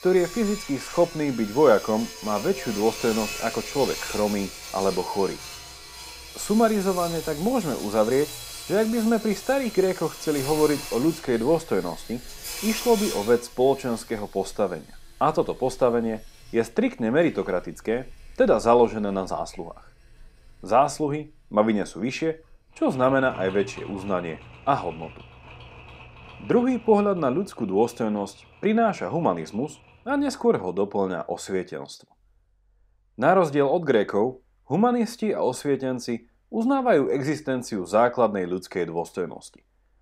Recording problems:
machinery noise; noticeable; throughout; 10 dB below the speech

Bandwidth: 15.5 kHz